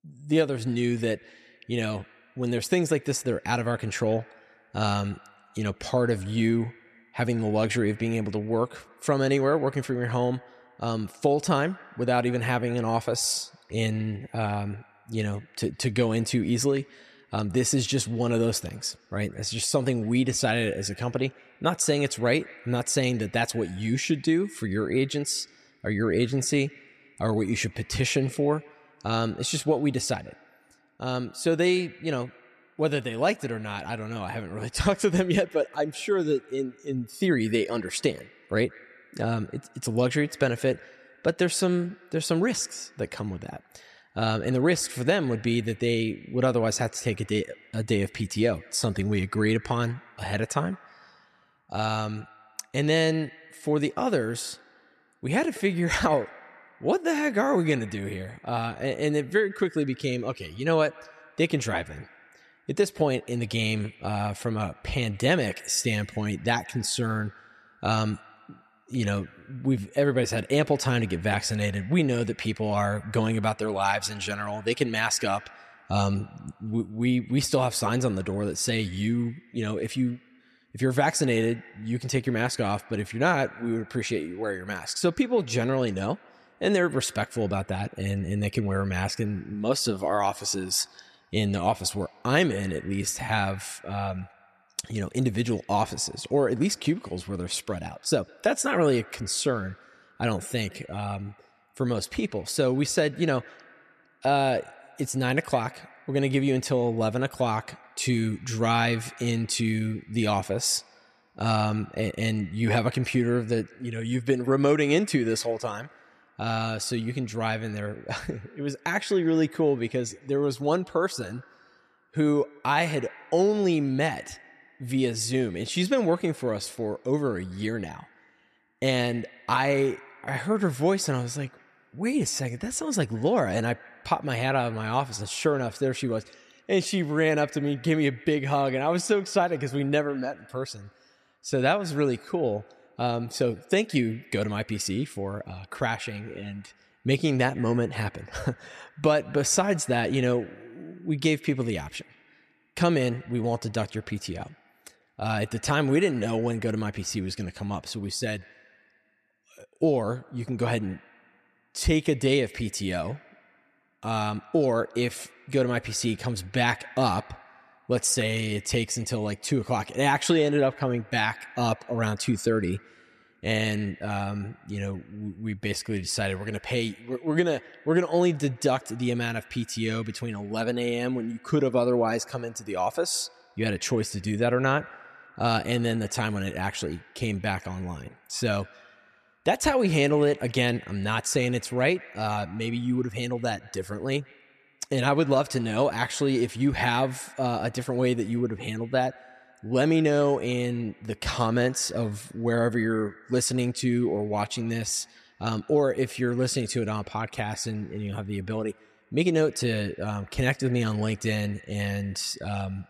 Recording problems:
echo of what is said; faint; throughout; 160 ms later, 25 dB below the speech

